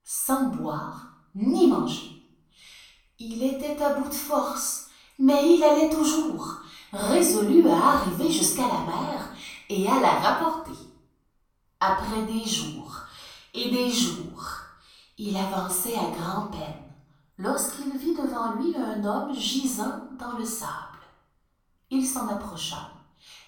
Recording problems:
off-mic speech; far
room echo; noticeable; dies away in 0.5 s

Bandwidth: 17.5 kHz